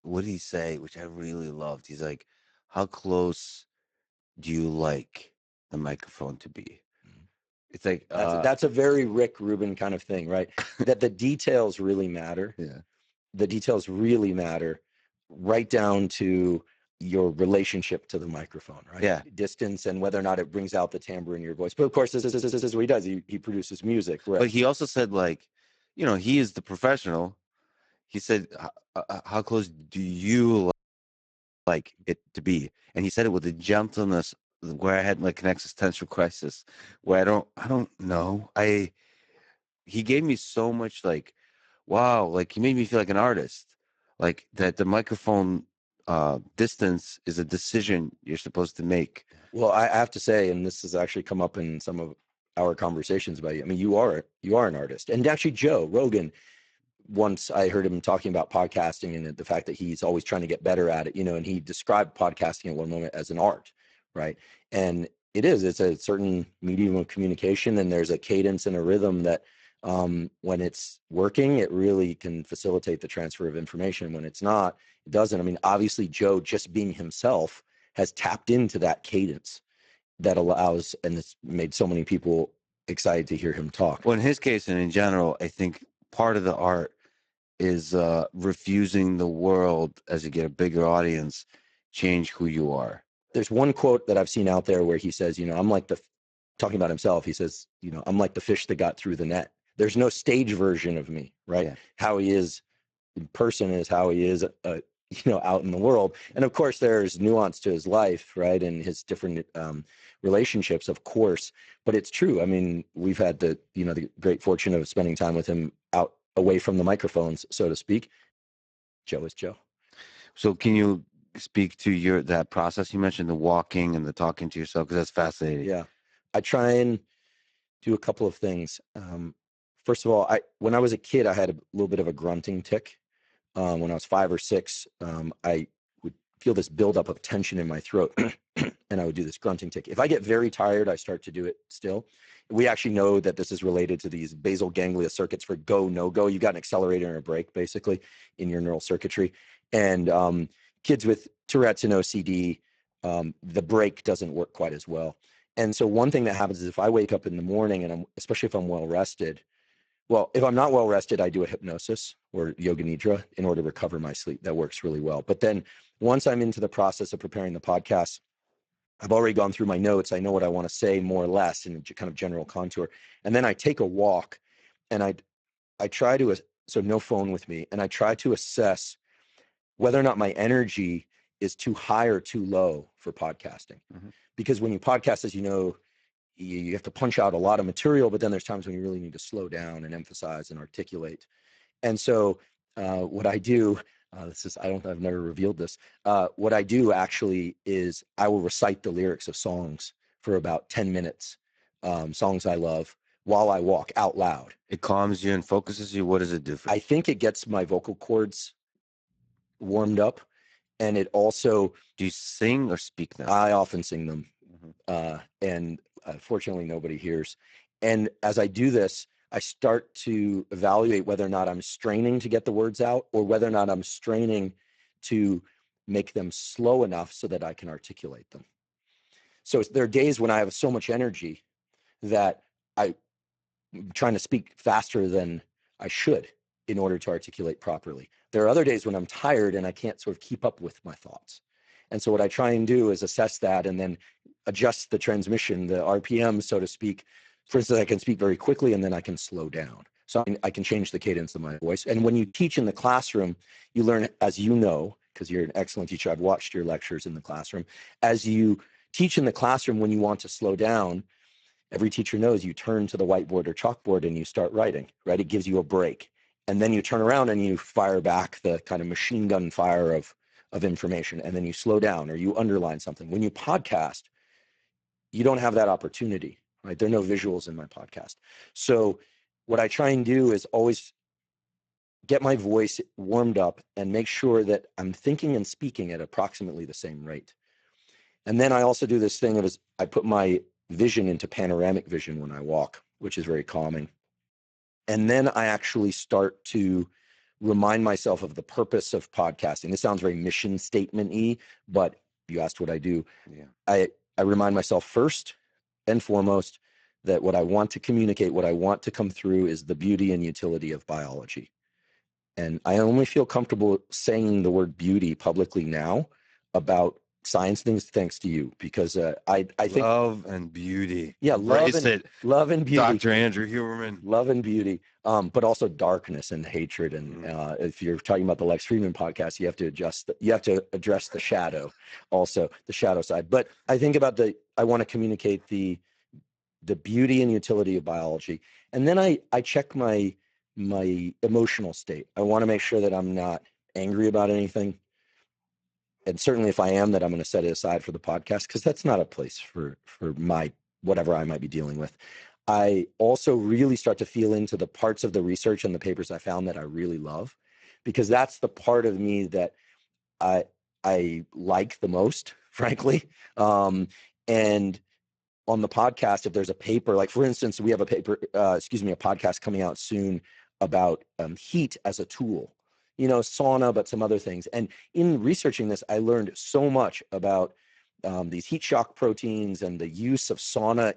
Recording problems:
garbled, watery; badly; nothing above 7.5 kHz
audio stuttering; at 22 s
audio freezing; at 31 s for 1 s
choppy; very; from 4:10 to 4:12; 5% of the speech affected

